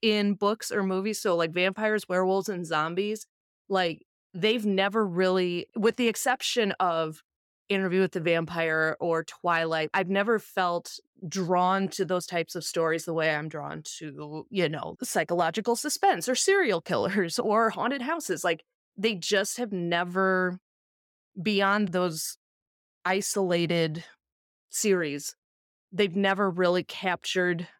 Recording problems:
none

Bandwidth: 17.5 kHz